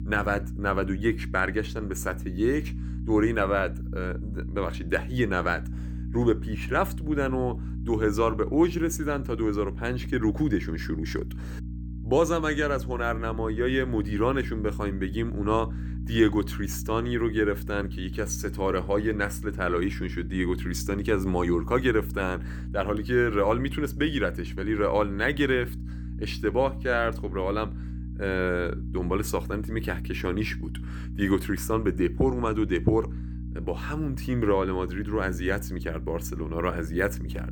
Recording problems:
electrical hum; noticeable; throughout; 60 Hz, 20 dB below the speech

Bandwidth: 18.5 kHz